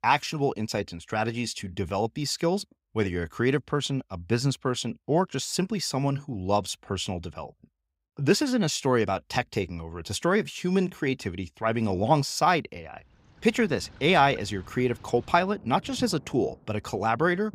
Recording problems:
rain or running water; faint; from 13 s on; 20 dB below the speech

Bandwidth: 15.5 kHz